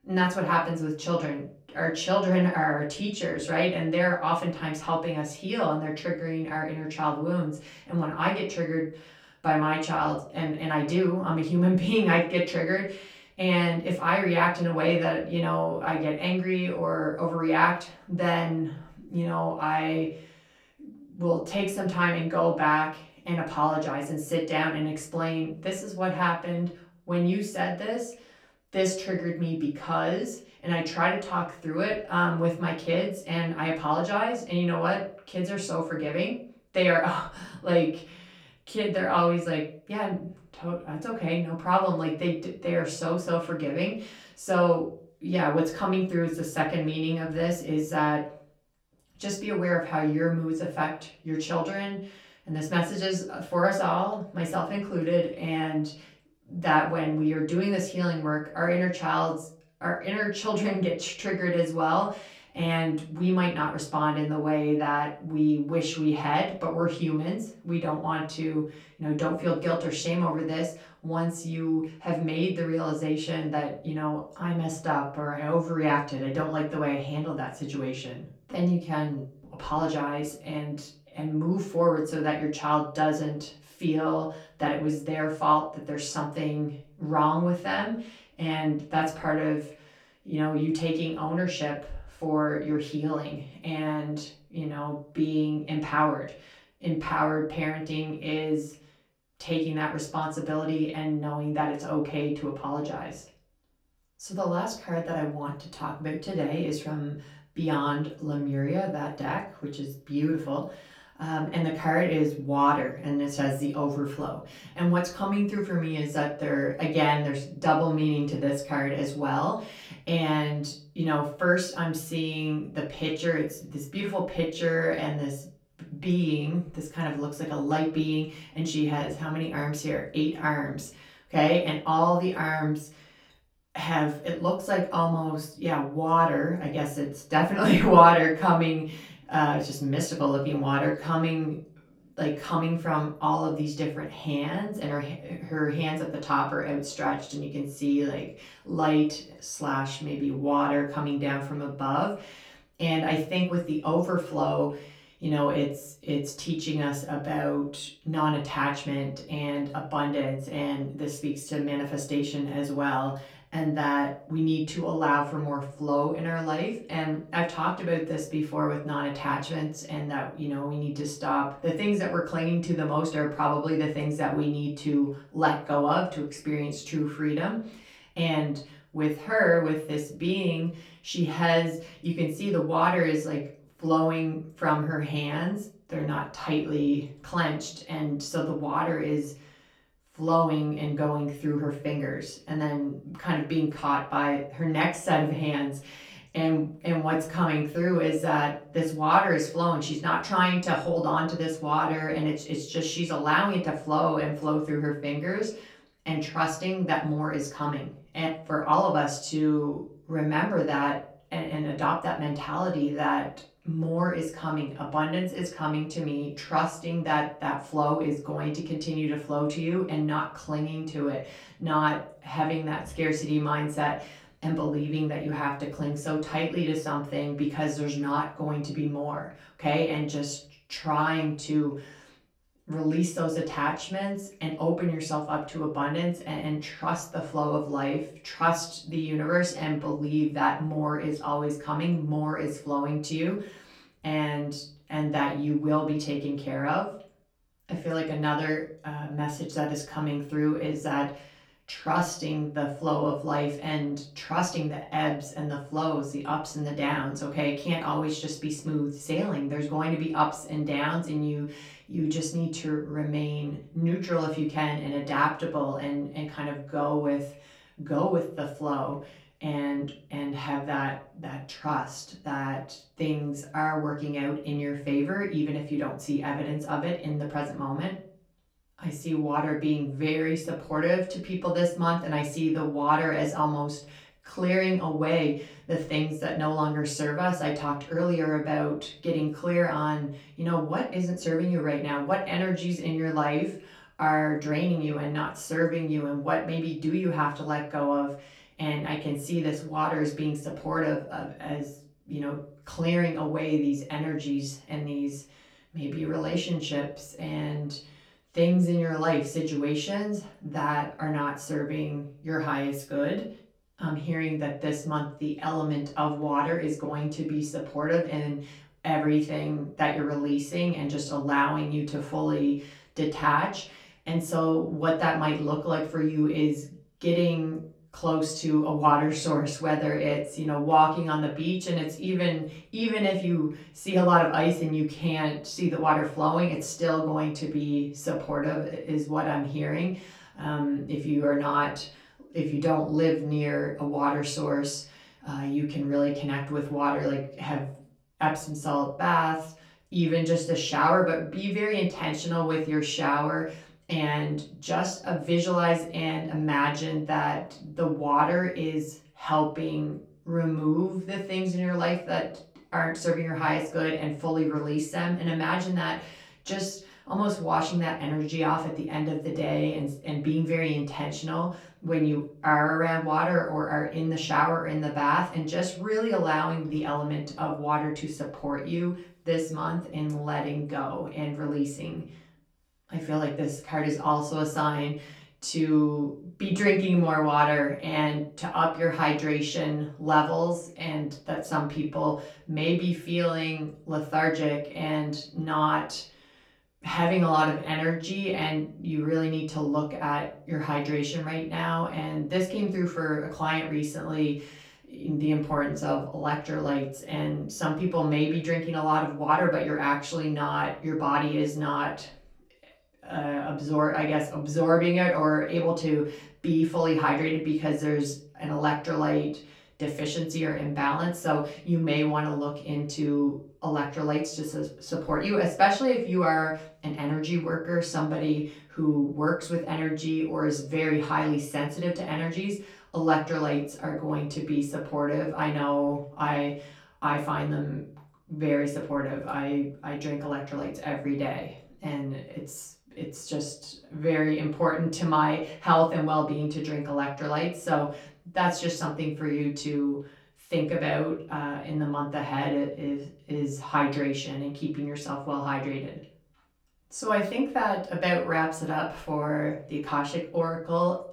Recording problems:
off-mic speech; far
room echo; slight; dies away in 0.3 s

